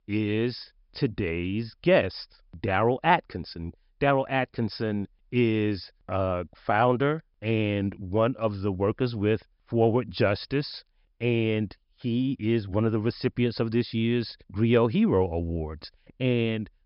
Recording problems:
high frequencies cut off; noticeable; nothing above 5.5 kHz

